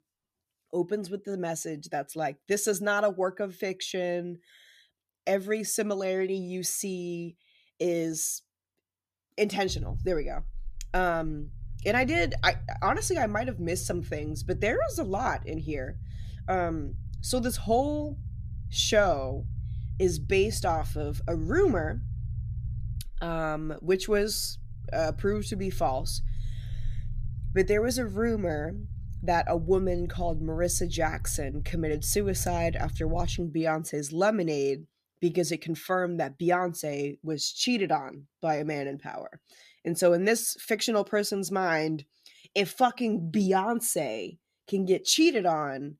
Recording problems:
low rumble; faint; from 9.5 to 33 s; 25 dB below the speech

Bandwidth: 14.5 kHz